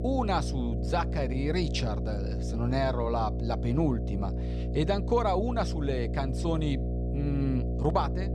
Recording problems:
electrical hum; loud; throughout; 60 Hz, 10 dB below the speech

